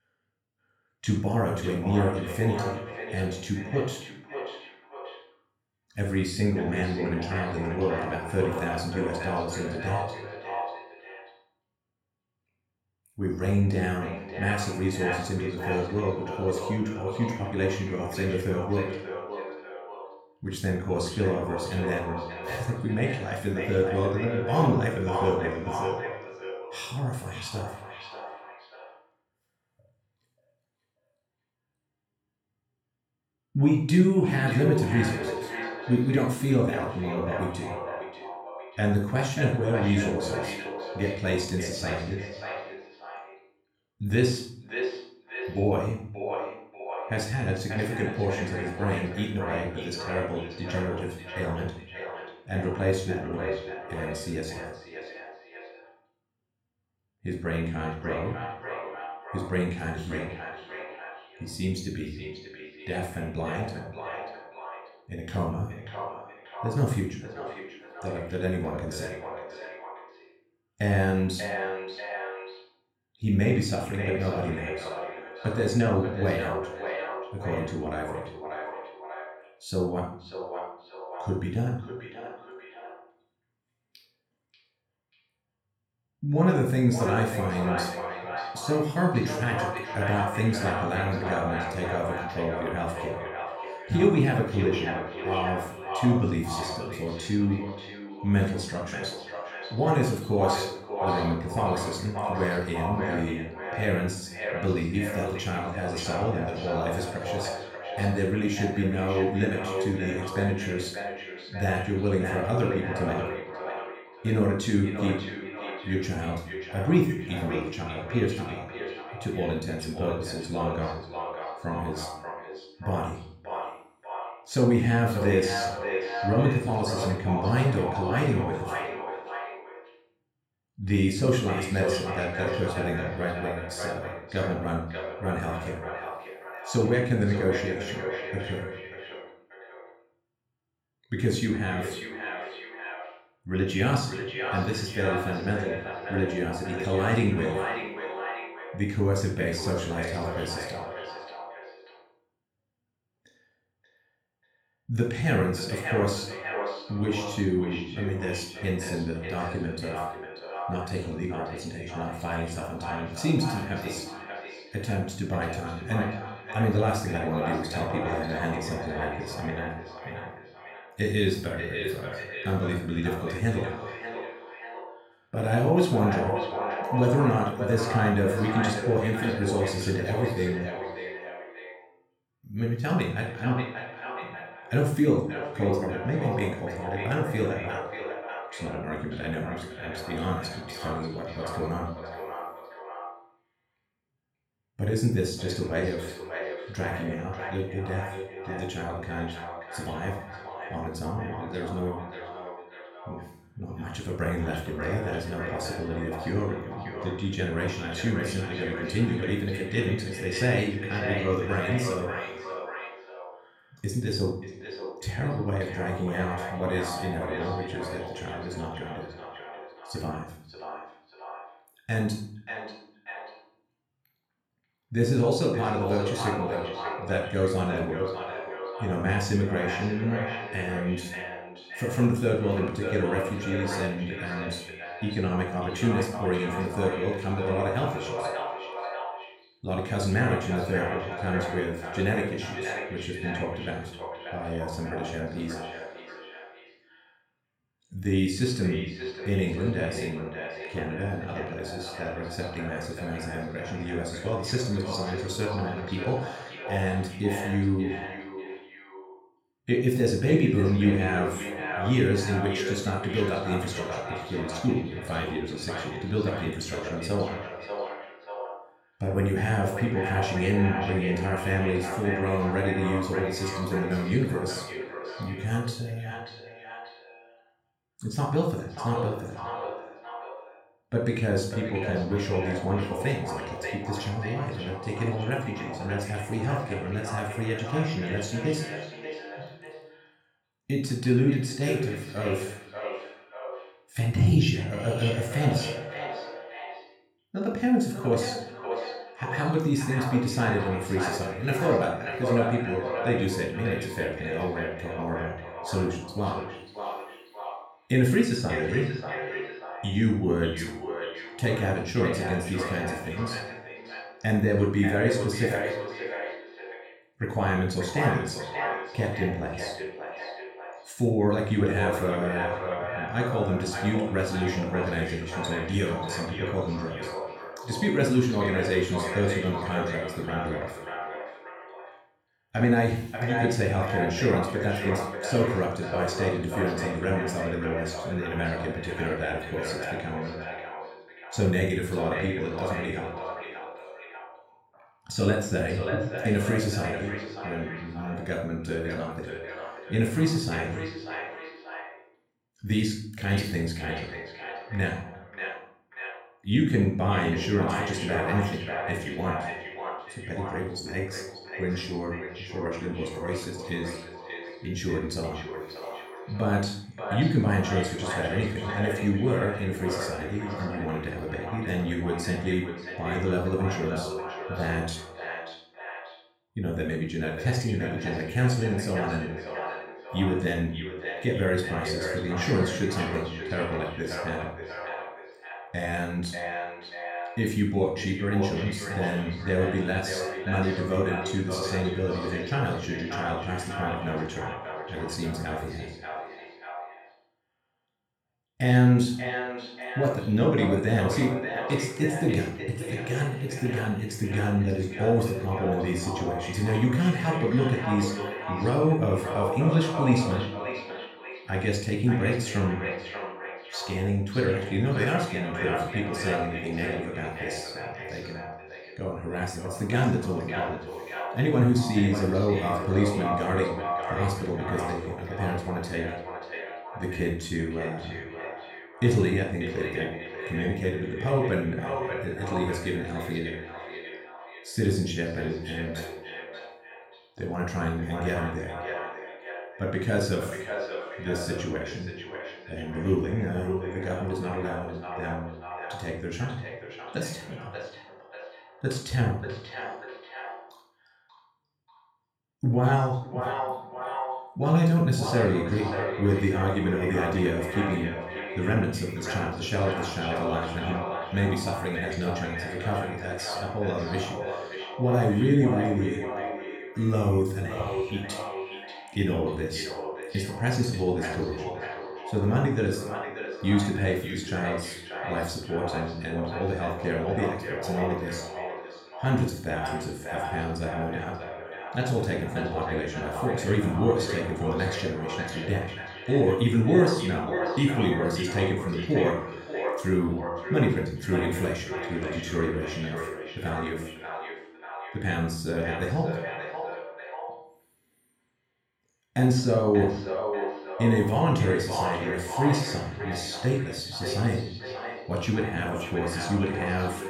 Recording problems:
echo of what is said; strong; throughout; 590 ms later, 7 dB below the speech
room echo; noticeable; dies away in 0.5 s
off-mic speech; somewhat distant

